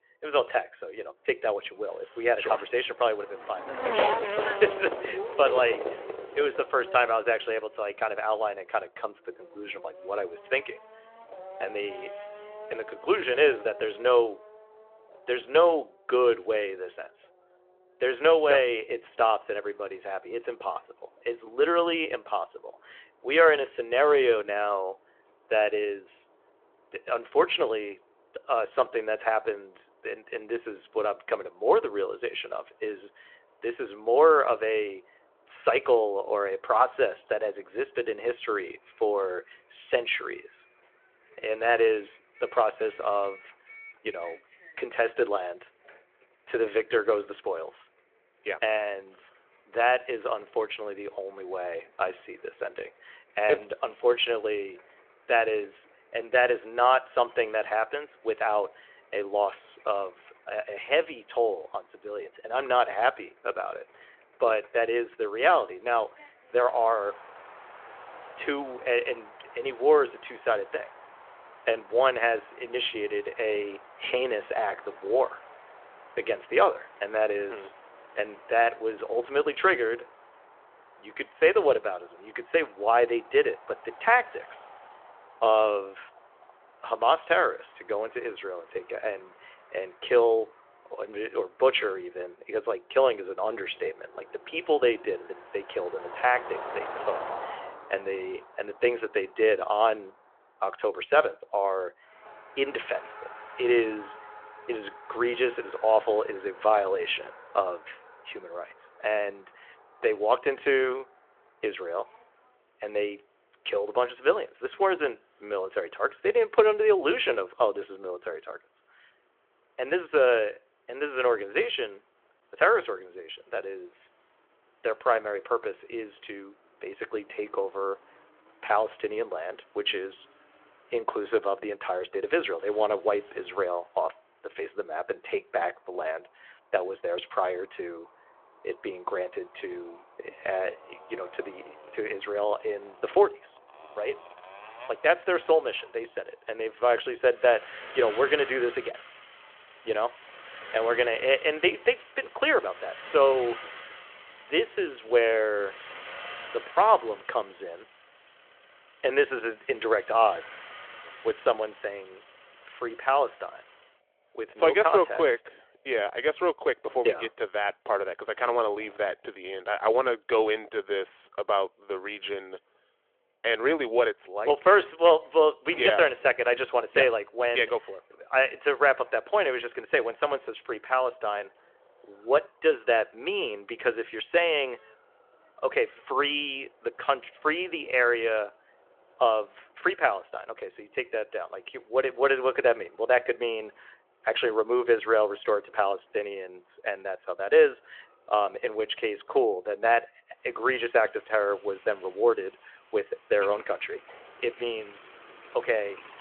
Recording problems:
phone-call audio
traffic noise; noticeable; throughout; 15 dB below the speech

